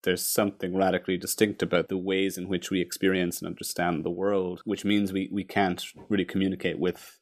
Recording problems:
none

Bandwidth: 14.5 kHz